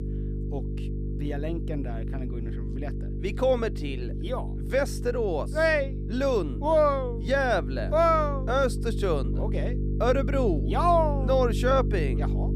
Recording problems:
electrical hum; noticeable; throughout; 50 Hz, 15 dB below the speech

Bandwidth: 14.5 kHz